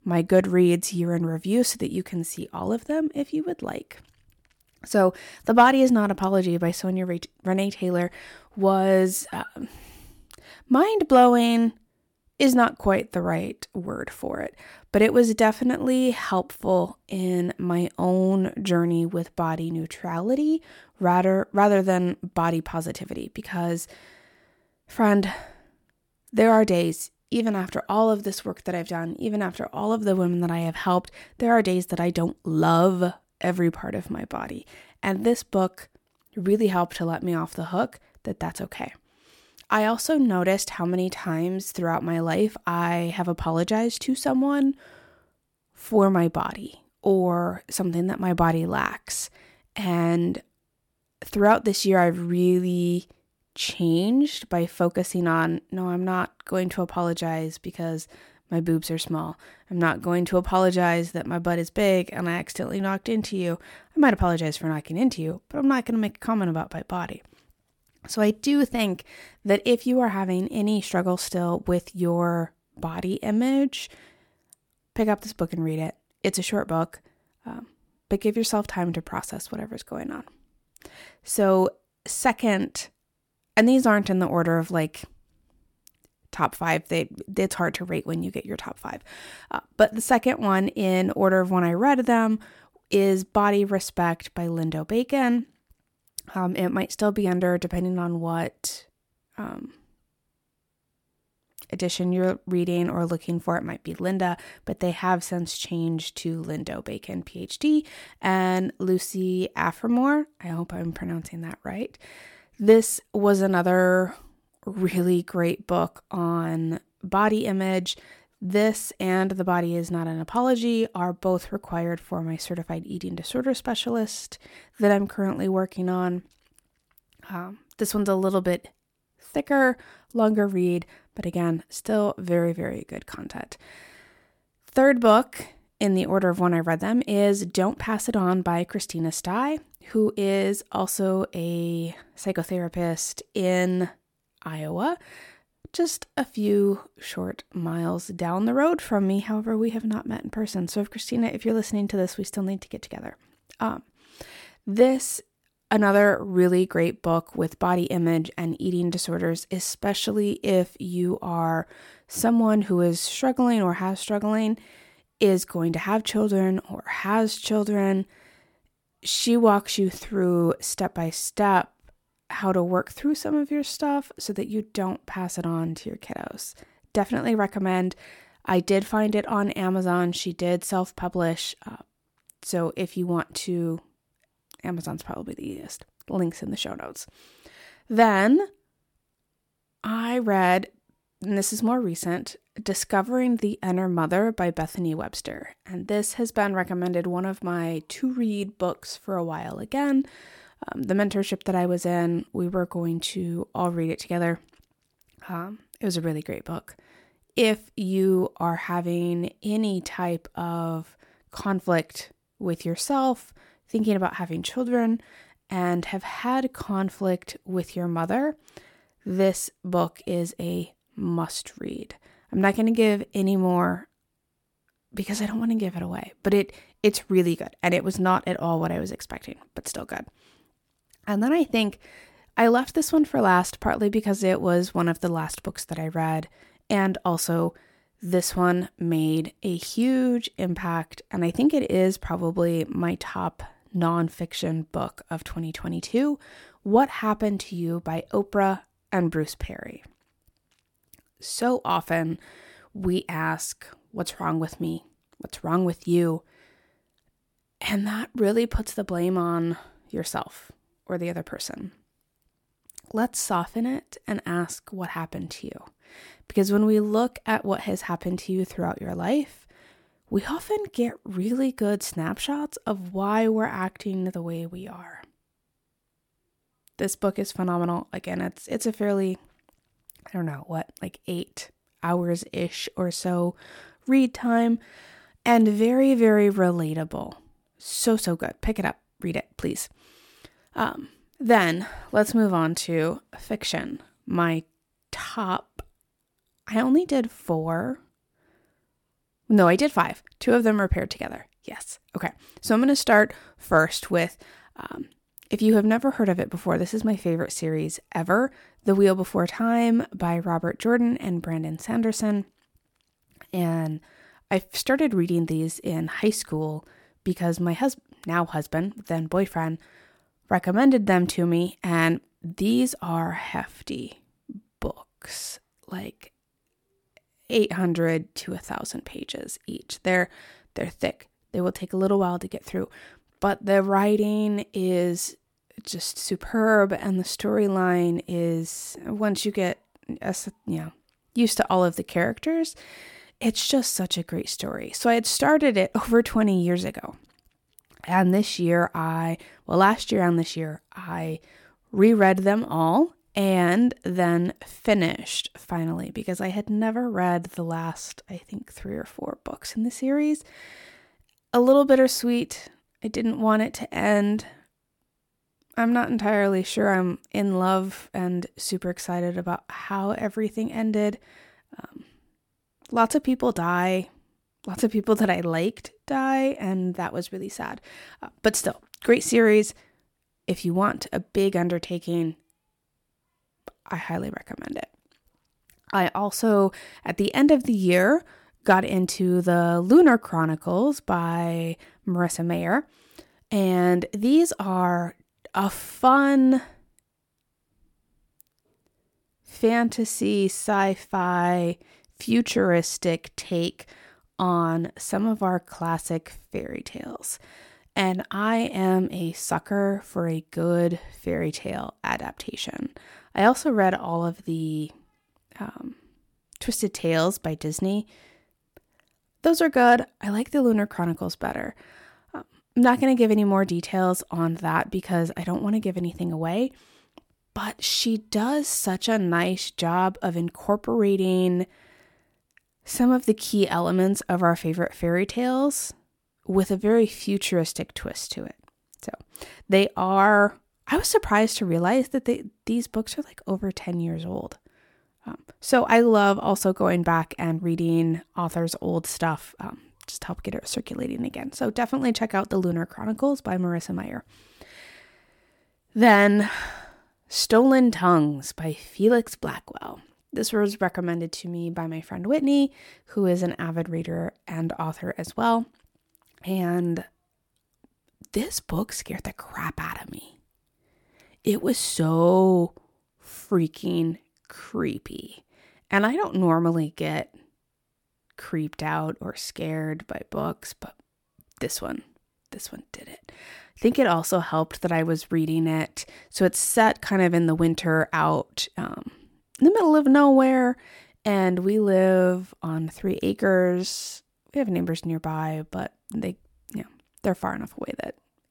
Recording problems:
none

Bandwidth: 17 kHz